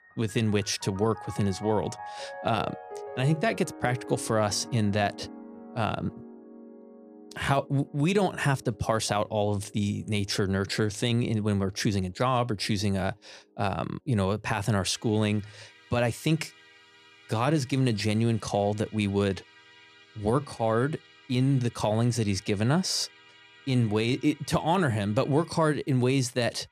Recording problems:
background music; noticeable; throughout; 20 dB below the speech

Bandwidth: 14.5 kHz